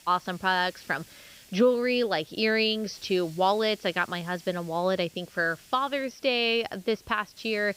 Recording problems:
high frequencies cut off; noticeable; nothing above 6 kHz
hiss; faint; throughout; 25 dB below the speech

